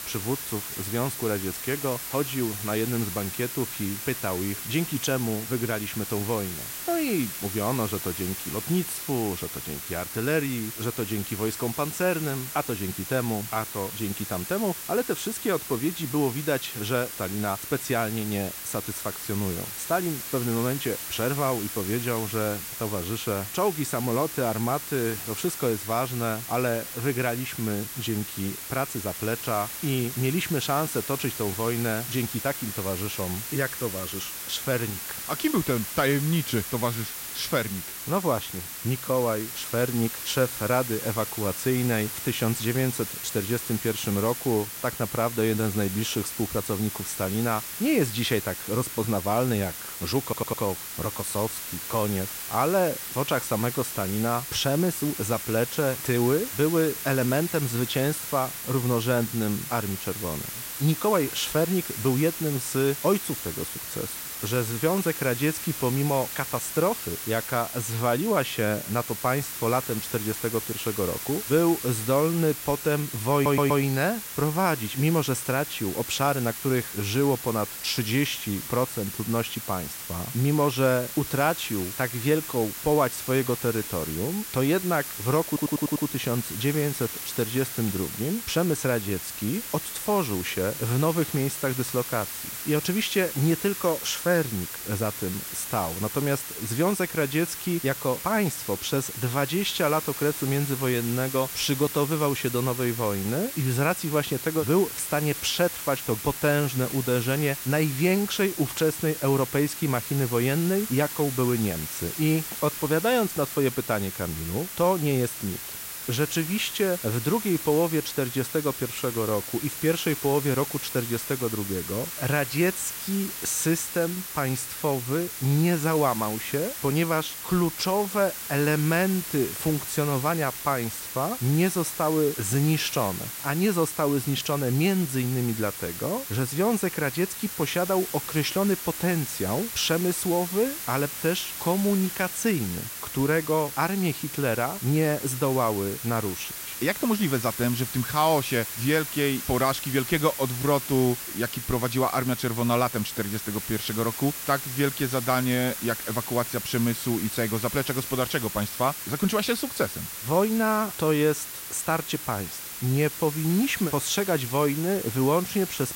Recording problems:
hiss; loud; throughout; 6 dB below the speech
audio stuttering; at 50 s, at 1:13 and at 1:25

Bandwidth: 16 kHz